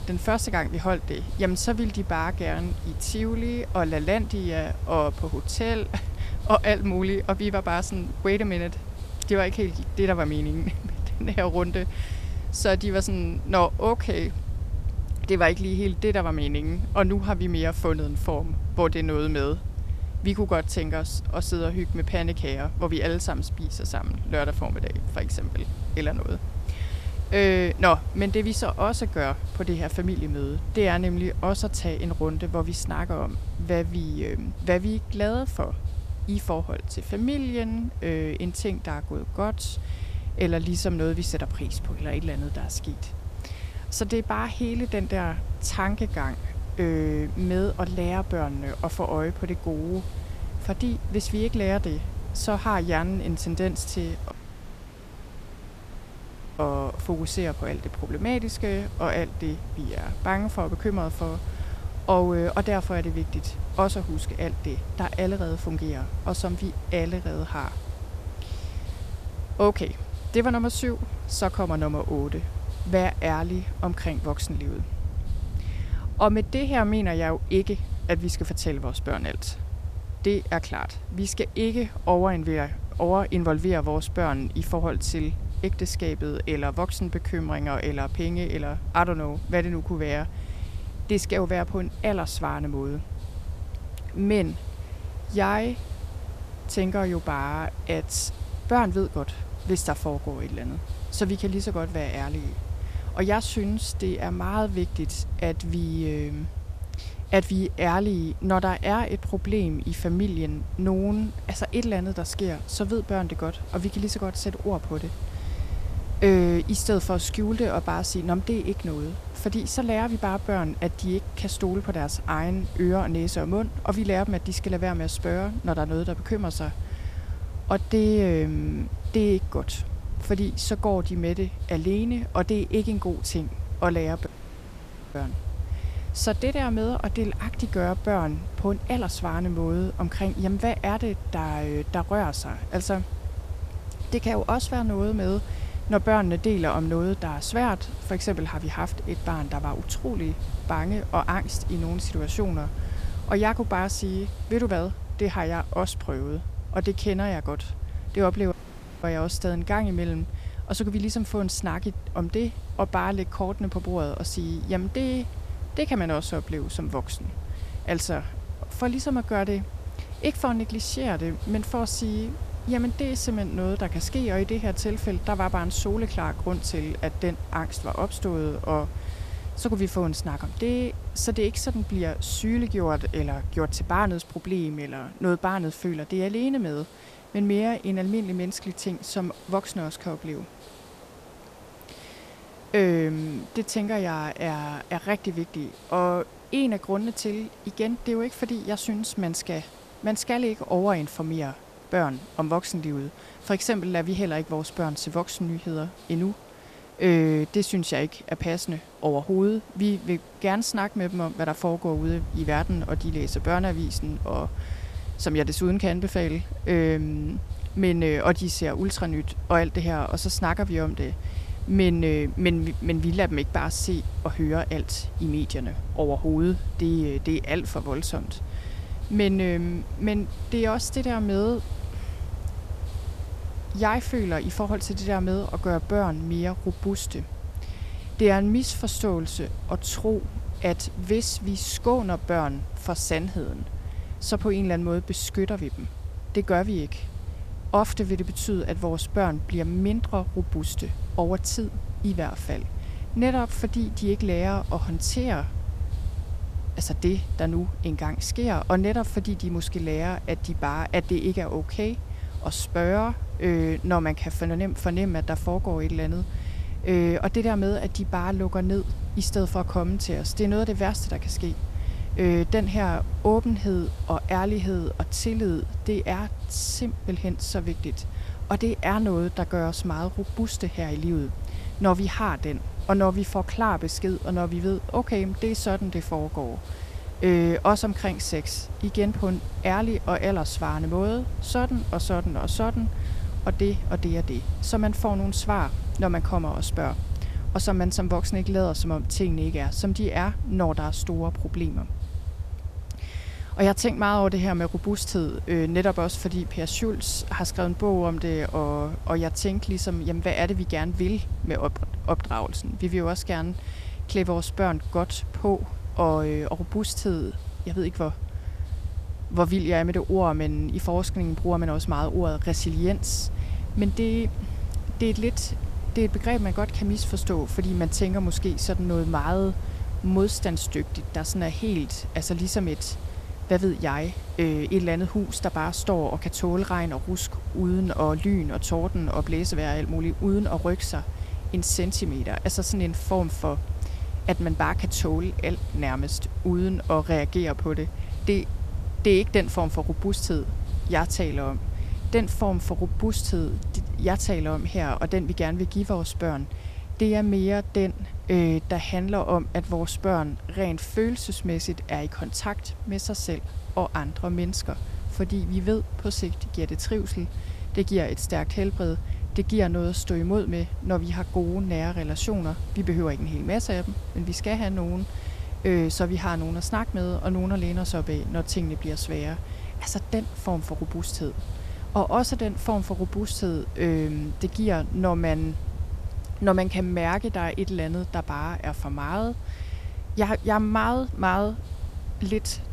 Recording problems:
hiss; faint; throughout; 20 dB below the speech
low rumble; faint; until 3:04 and from 3:32 on; 20 dB below the speech
audio cutting out; at 54 s for 2.5 s, at 2:14 for 1 s and at 2:39 for 0.5 s

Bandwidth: 14.5 kHz